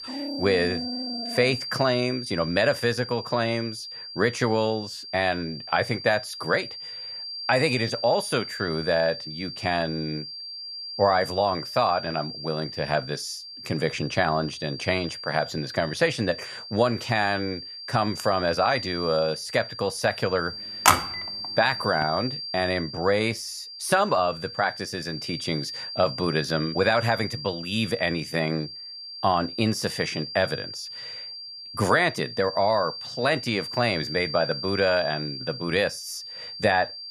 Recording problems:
high-pitched whine; loud; throughout; 4.5 kHz, 8 dB below the speech
dog barking; noticeable; until 1.5 s; peak 8 dB below the speech
phone ringing; loud; at 21 s; peak 6 dB above the speech

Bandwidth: 14.5 kHz